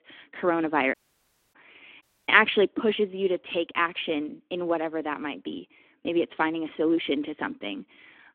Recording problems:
phone-call audio; nothing above 3.5 kHz
audio cutting out; at 1 s for 0.5 s and at 2 s

